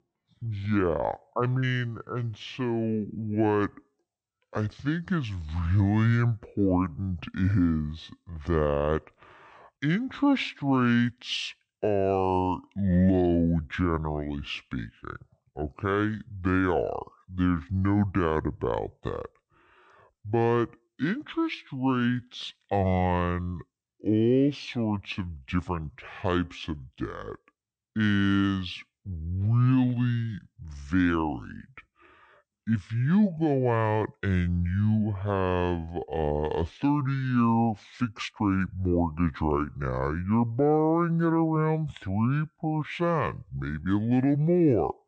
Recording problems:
wrong speed and pitch; too slow and too low; 0.6 times normal speed

